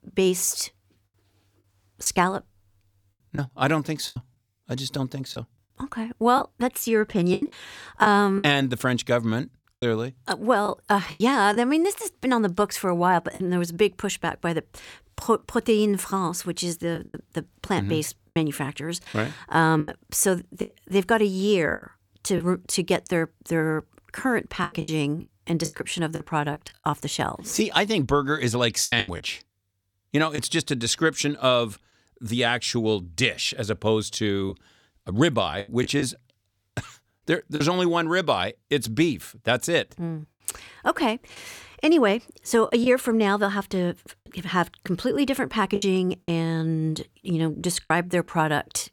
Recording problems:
choppy; very; 6% of the speech affected

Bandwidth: 18.5 kHz